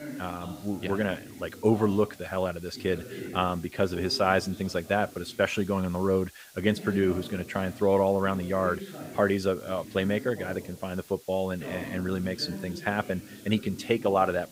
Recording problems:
voice in the background; noticeable; throughout; 15 dB below the speech
hiss; faint; throughout; 25 dB below the speech

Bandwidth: 15.5 kHz